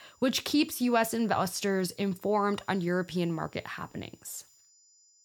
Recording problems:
high-pitched whine; faint; throughout; 7 kHz, 30 dB below the speech

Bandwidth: 18.5 kHz